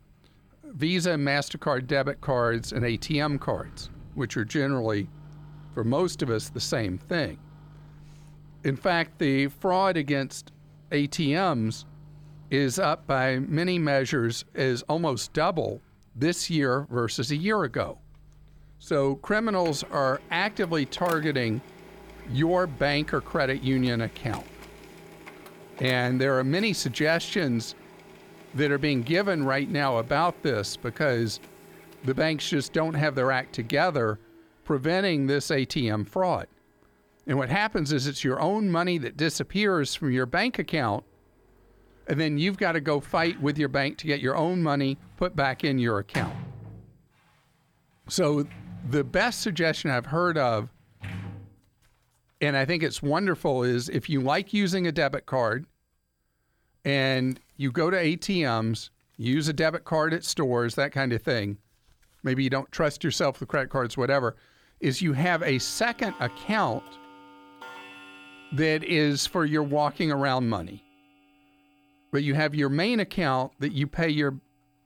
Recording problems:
household noises; faint; throughout; 20 dB below the speech

